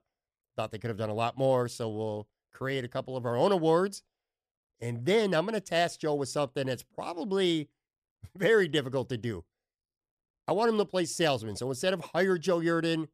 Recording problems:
none

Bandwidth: 14.5 kHz